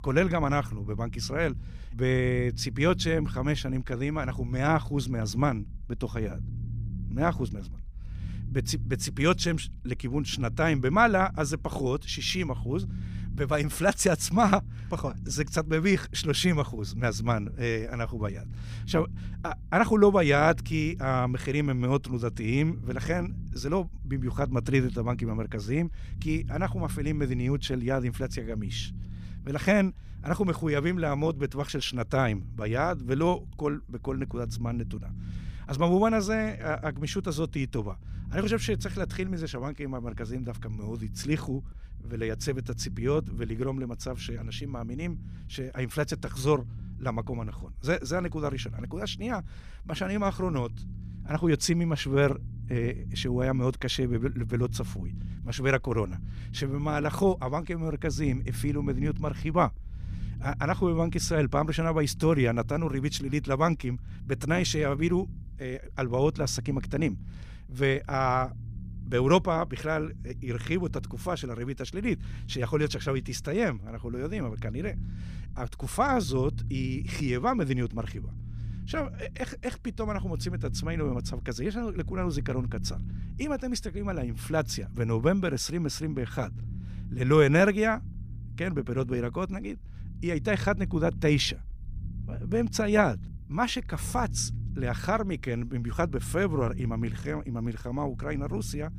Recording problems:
low rumble; faint; throughout; 20 dB below the speech

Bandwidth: 15 kHz